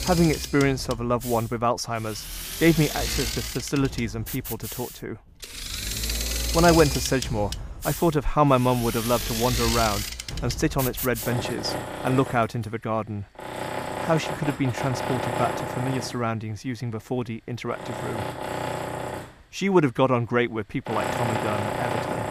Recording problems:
machinery noise; loud; throughout; 5 dB below the speech

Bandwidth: 15 kHz